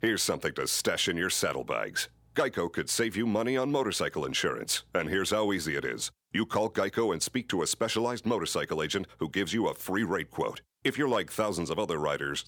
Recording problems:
none

